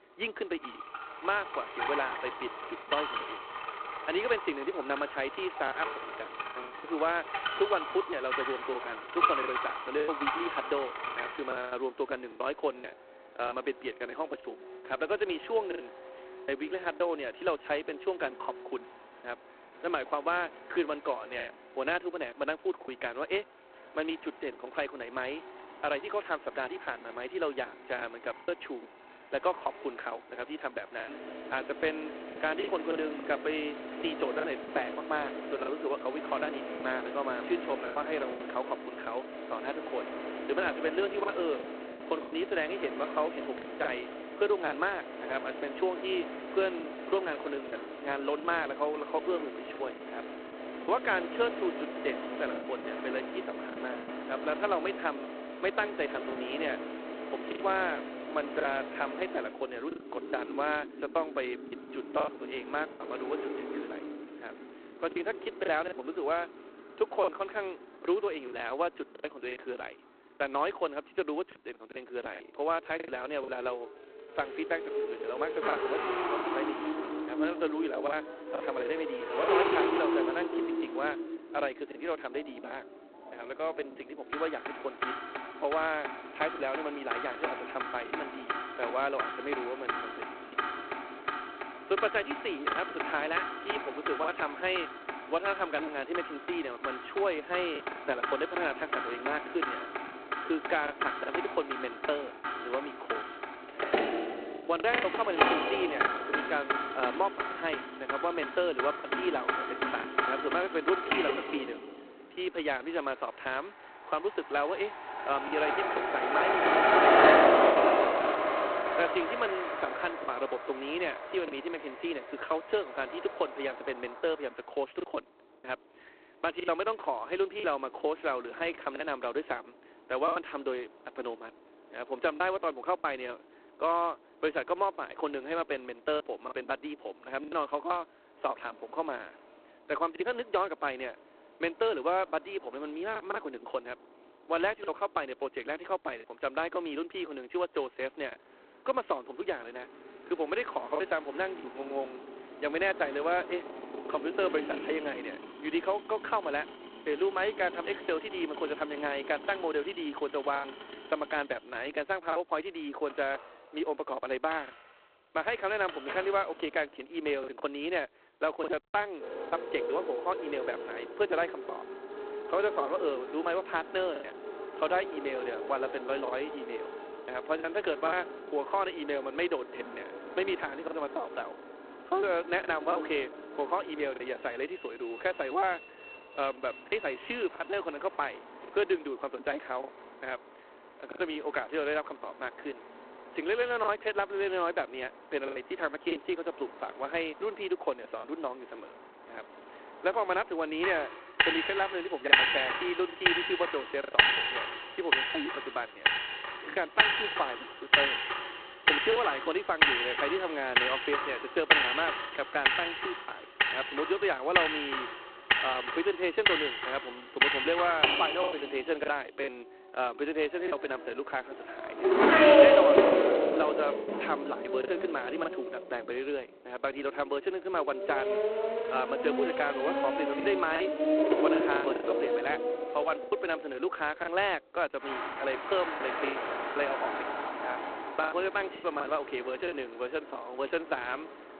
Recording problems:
phone-call audio; poor line; nothing above 4 kHz
traffic noise; very loud; throughout; 2 dB above the speech
choppy; occasionally; 4% of the speech affected

